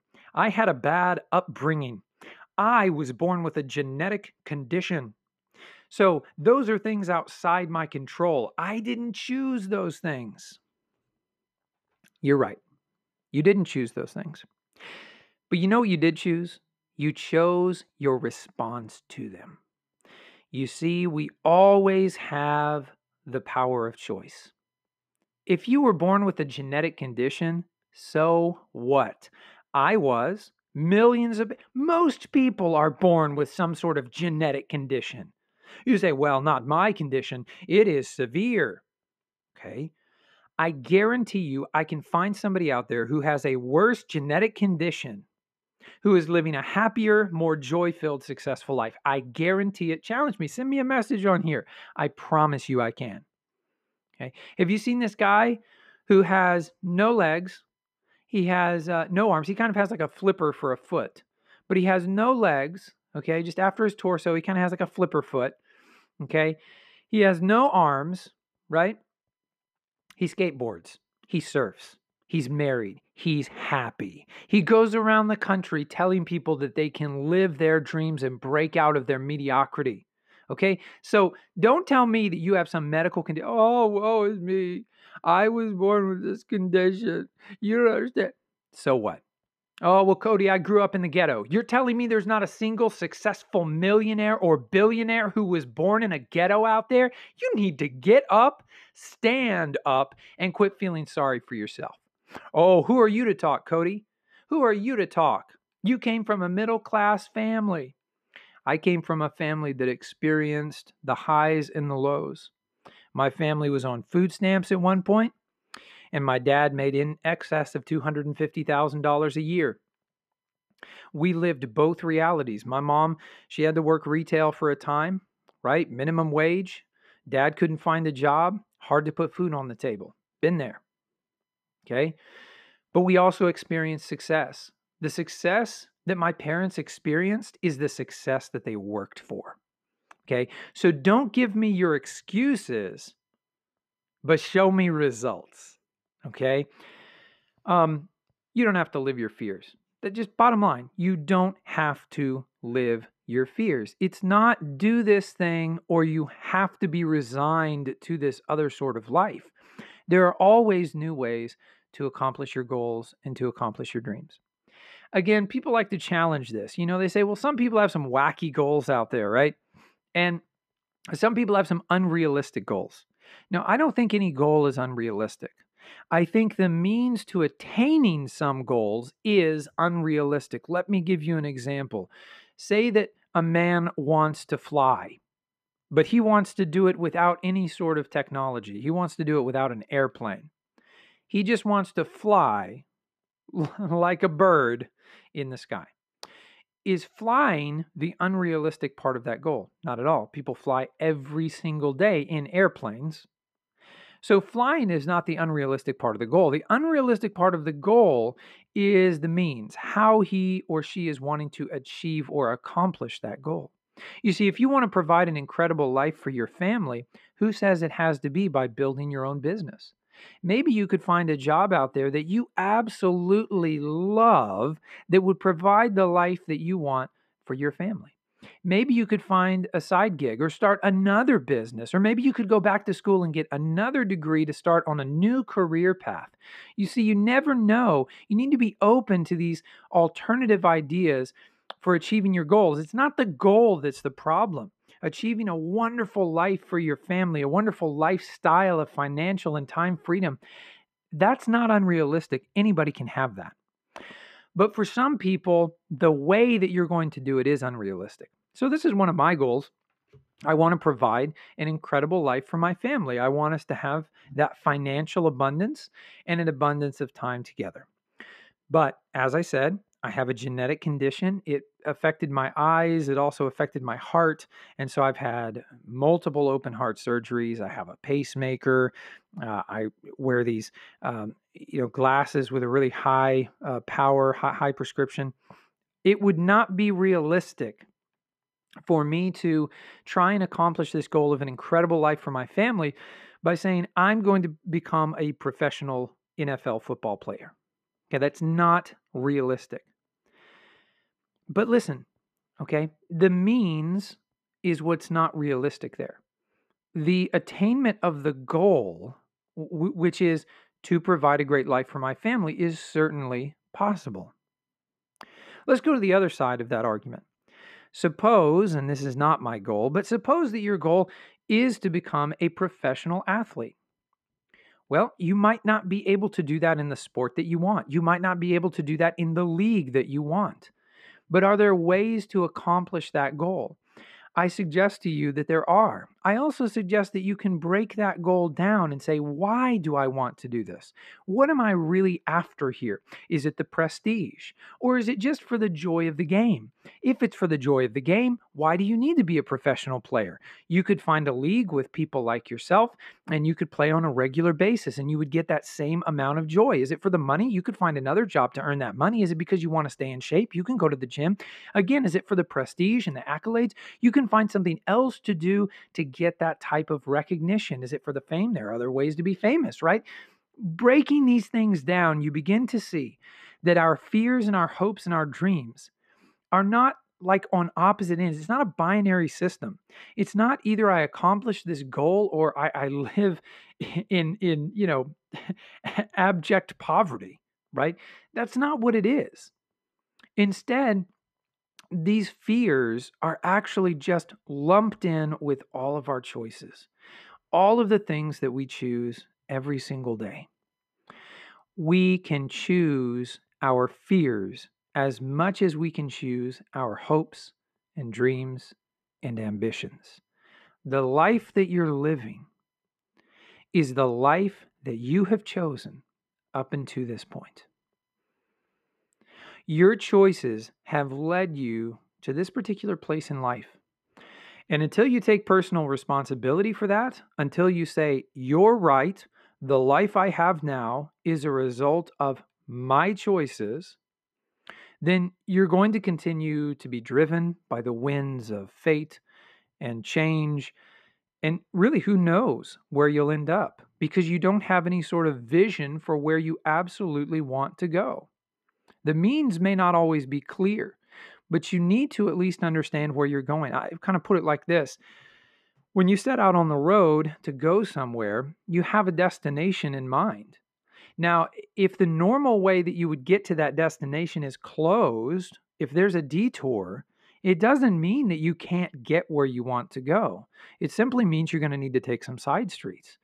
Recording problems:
muffled; slightly; fading above 4 kHz

